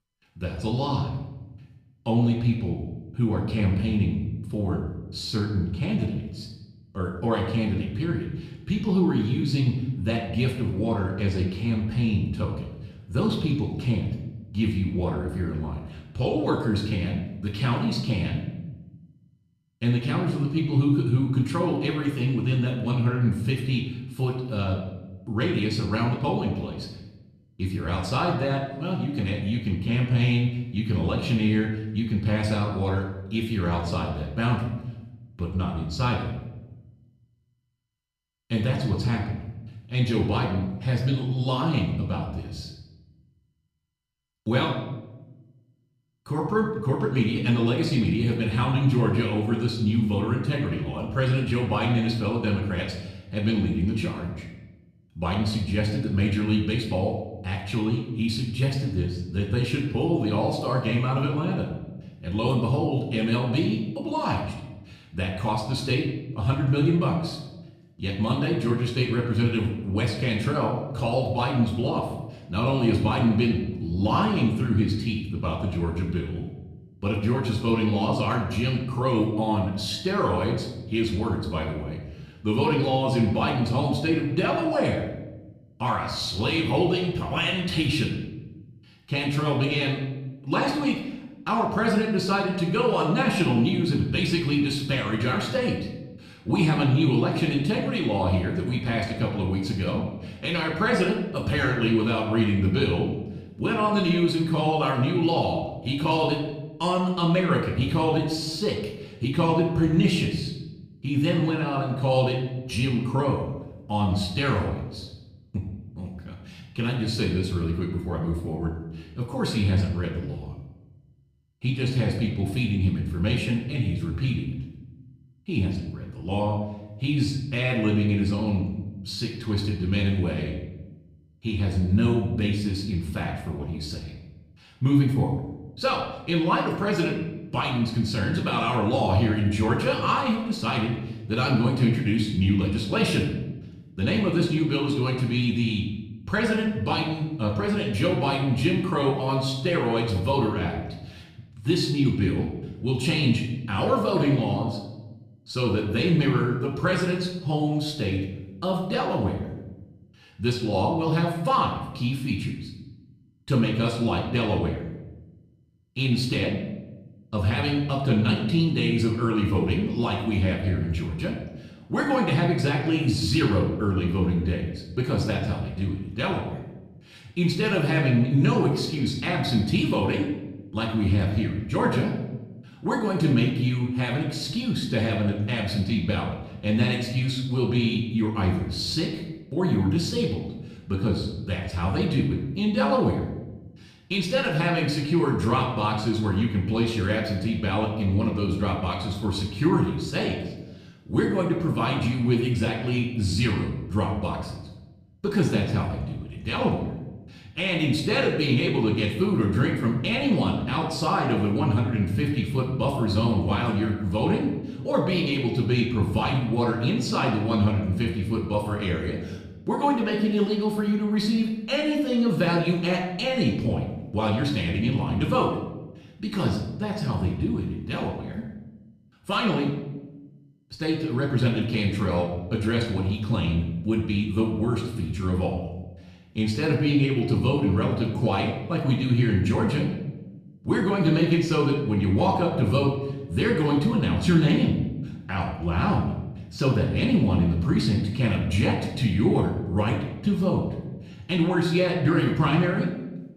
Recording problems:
off-mic speech; far
room echo; noticeable; dies away in 0.9 s

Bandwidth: 14.5 kHz